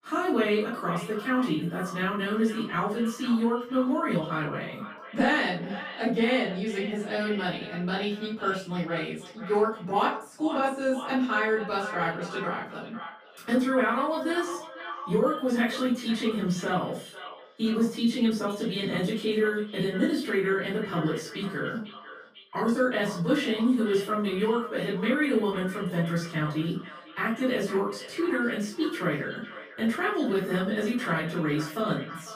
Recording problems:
off-mic speech; far
echo of what is said; noticeable; throughout; 500 ms later, 15 dB below the speech
room echo; slight; dies away in 0.3 s

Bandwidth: 15 kHz